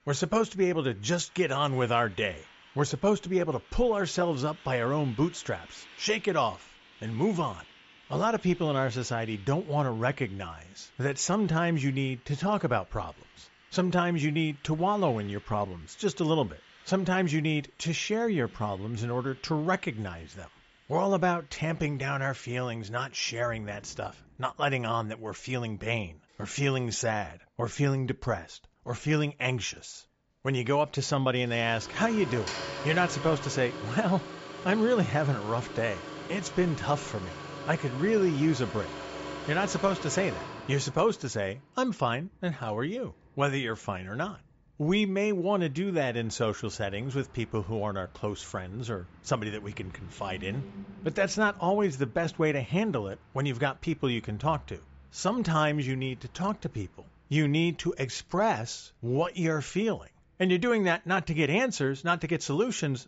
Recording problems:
high frequencies cut off; noticeable; nothing above 8 kHz
traffic noise; noticeable; throughout; 15 dB below the speech

